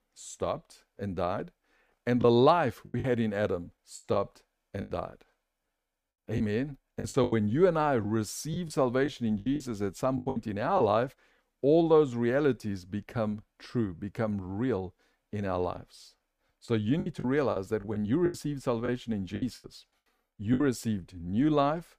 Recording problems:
choppy; very; from 2 to 5 s, from 6.5 to 11 s and from 17 to 21 s; 12% of the speech affected

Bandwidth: 15 kHz